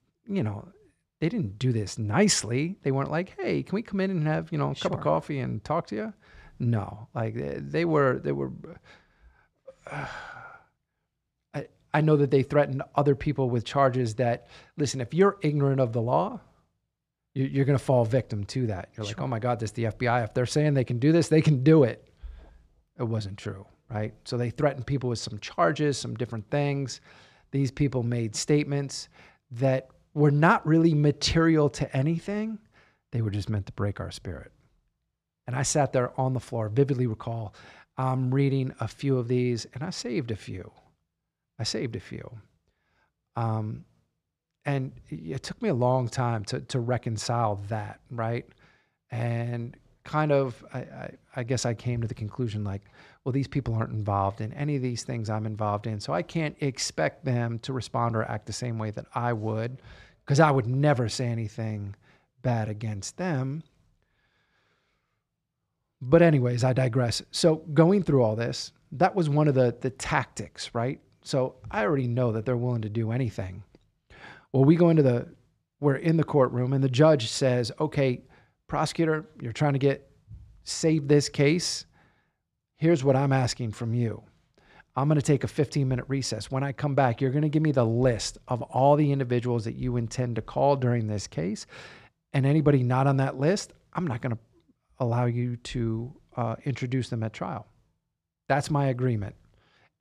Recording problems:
none

